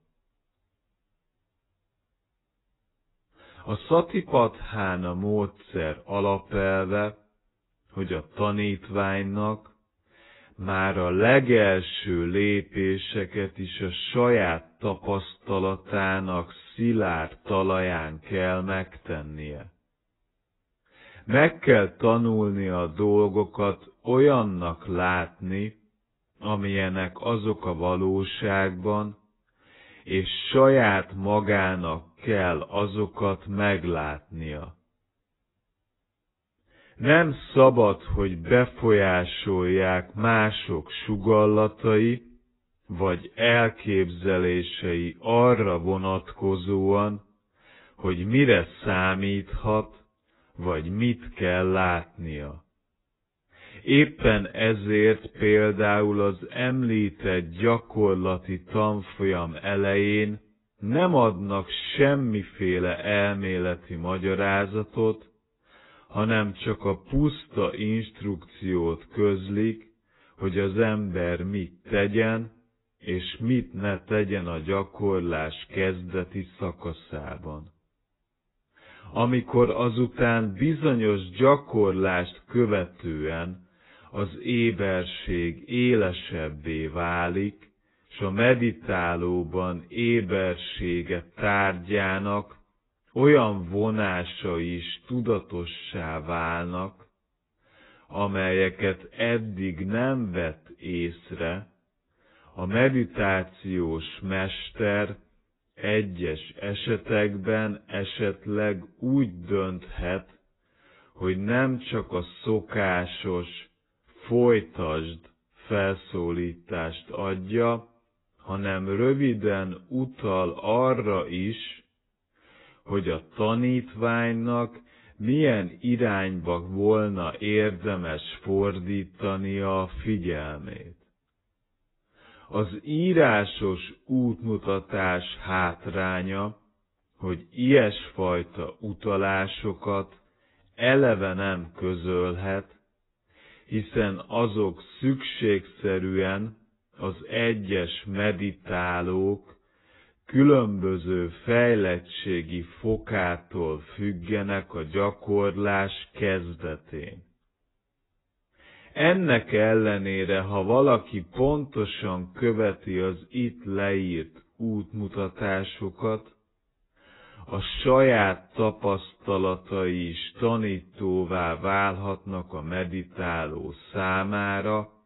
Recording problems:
garbled, watery; badly; nothing above 4 kHz
wrong speed, natural pitch; too slow; 0.7 times normal speed

